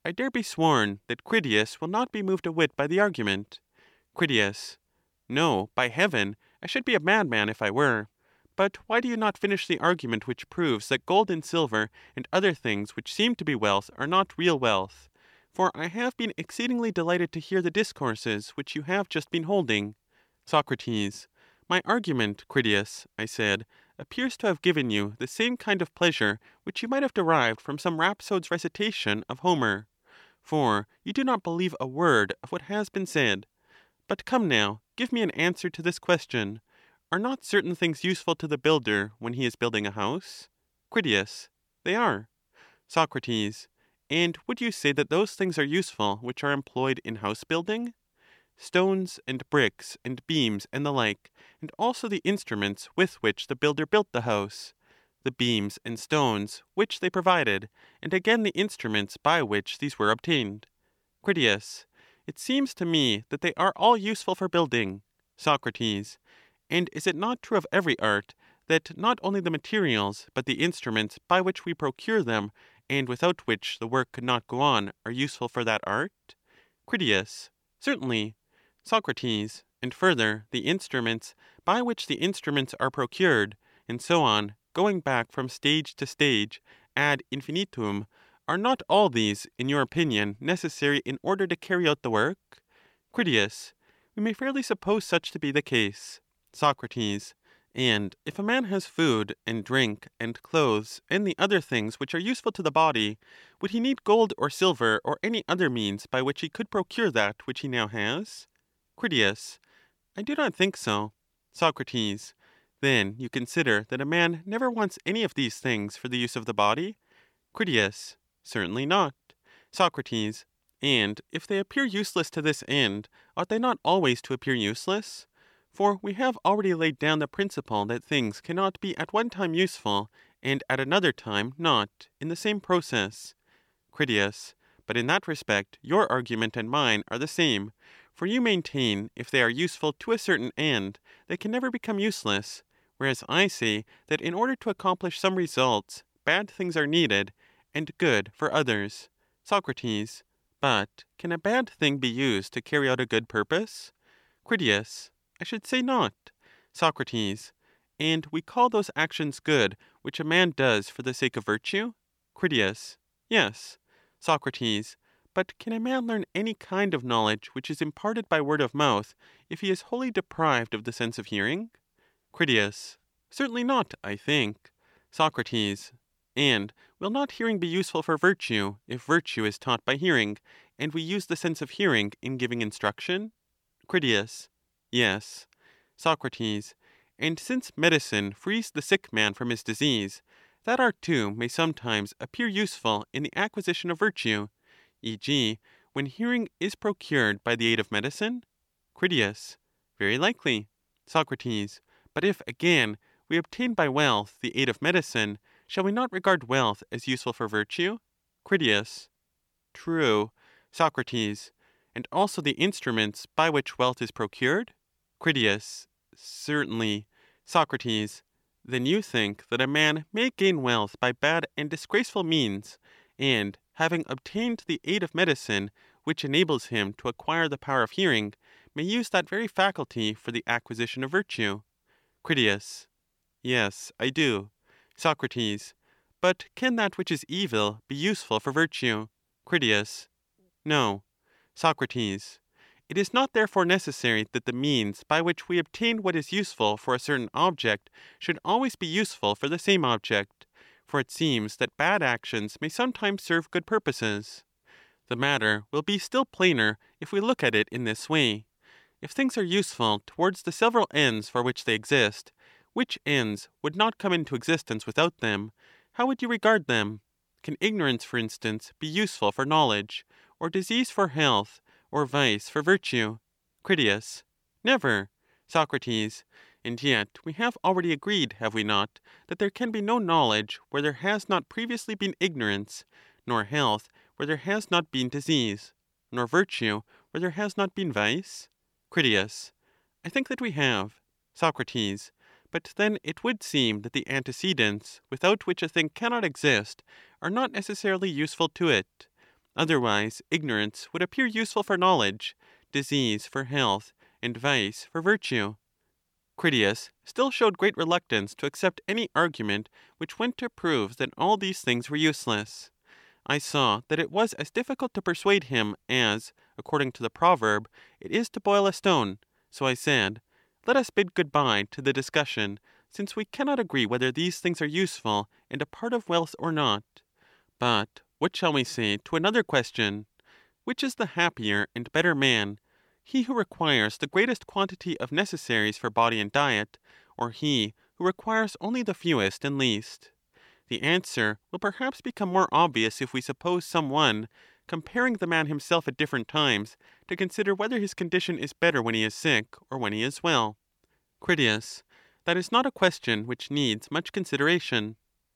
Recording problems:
none

